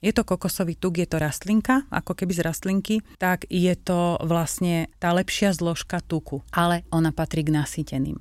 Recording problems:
none

